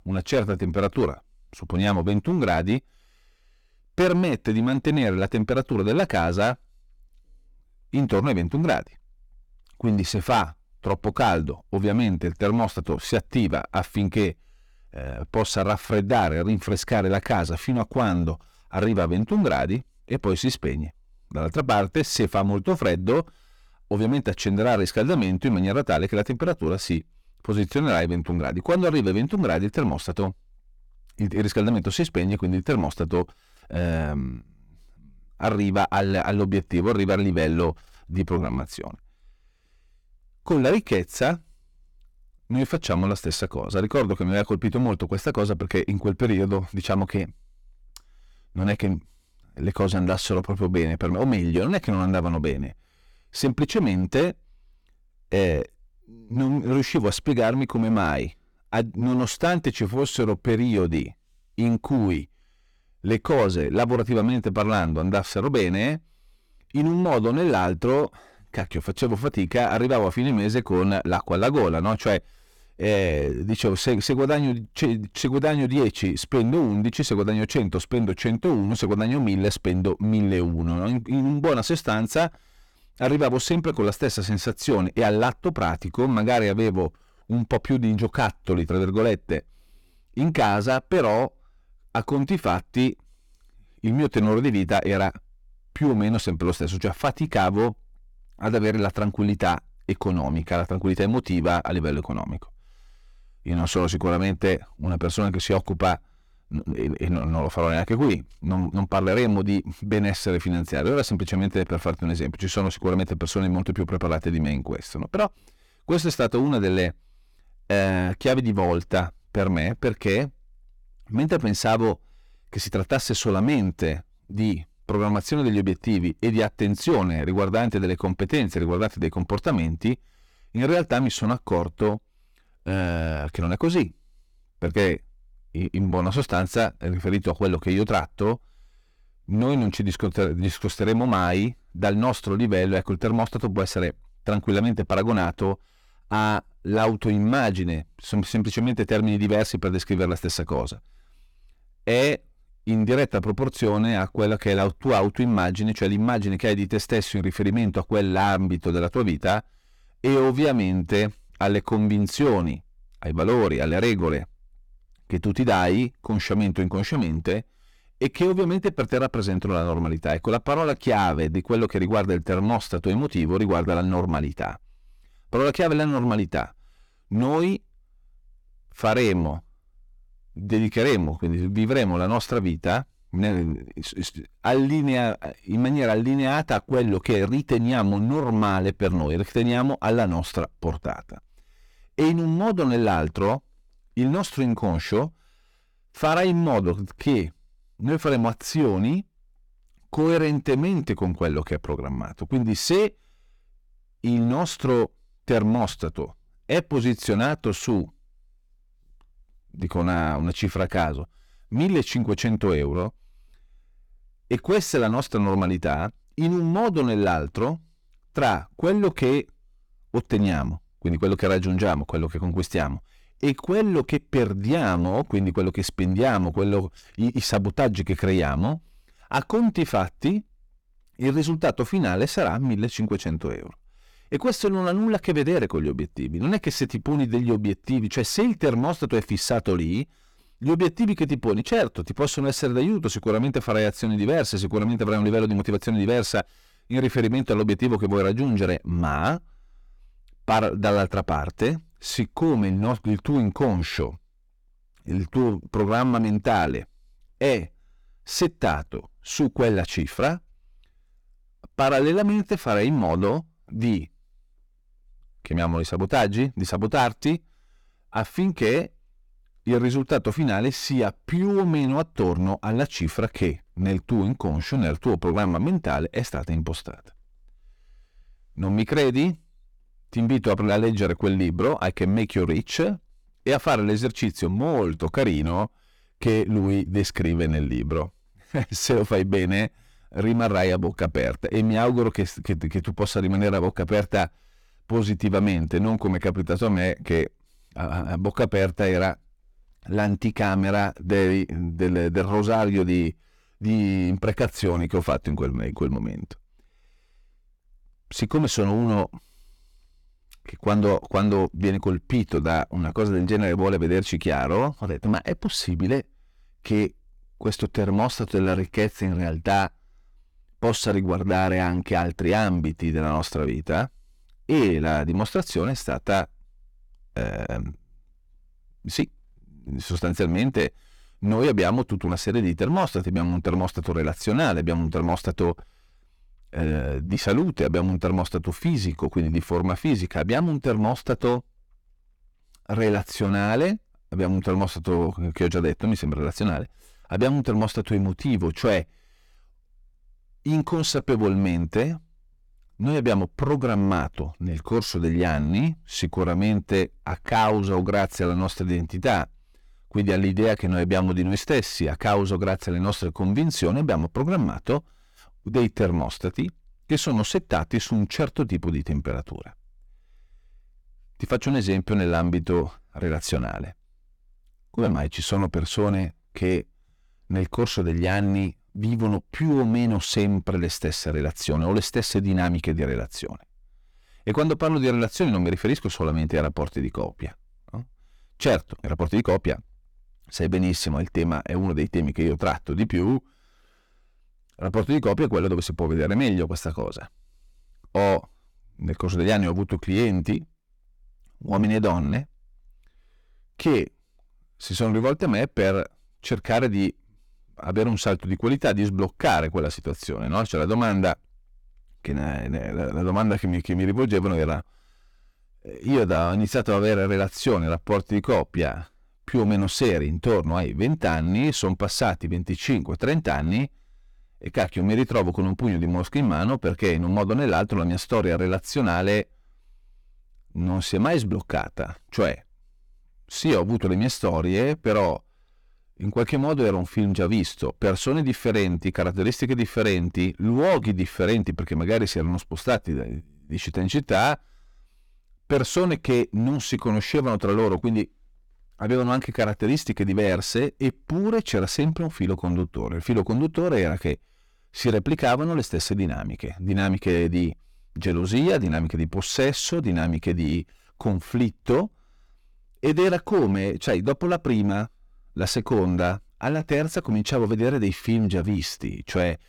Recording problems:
distortion; slight; 7% of the sound clipped
uneven, jittery; strongly; from 2:16 to 6:30

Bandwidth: 18.5 kHz